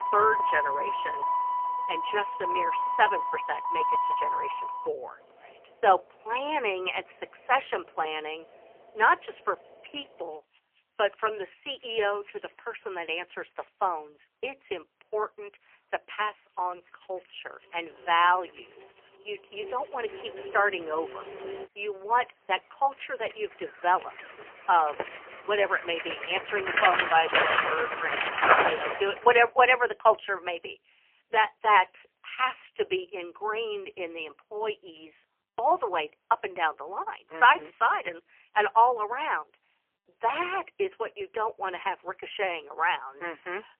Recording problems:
phone-call audio; poor line; nothing above 3 kHz
traffic noise; loud; until 29 s; 1 dB below the speech

